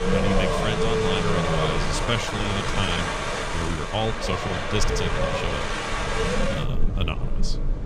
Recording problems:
wind in the background; very loud; throughout; 3 dB above the speech
high-pitched whine; faint; until 6.5 s; 6.5 kHz, 30 dB below the speech
uneven, jittery; strongly; from 2 to 7.5 s

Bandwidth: 14.5 kHz